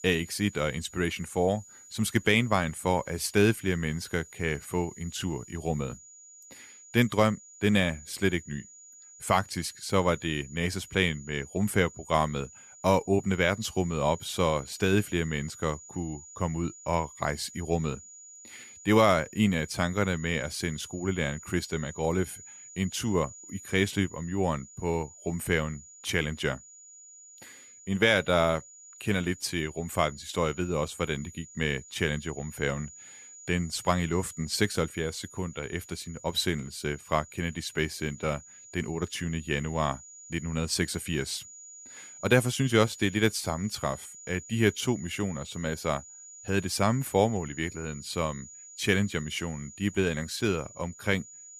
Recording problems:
high-pitched whine; noticeable; throughout; 7 kHz, 15 dB below the speech

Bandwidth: 14.5 kHz